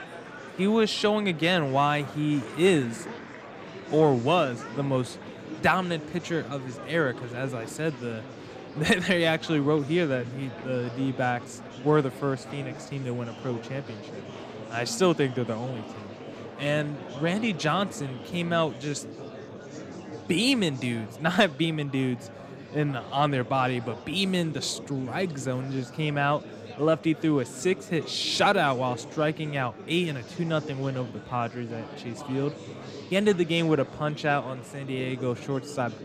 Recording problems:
murmuring crowd; noticeable; throughout; 15 dB below the speech

